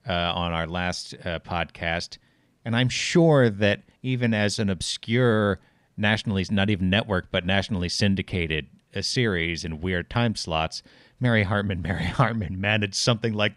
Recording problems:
none

